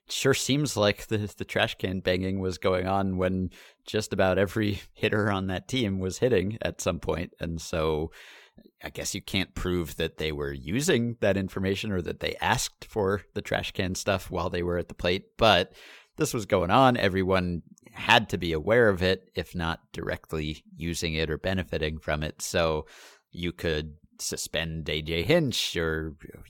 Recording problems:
none

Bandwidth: 17 kHz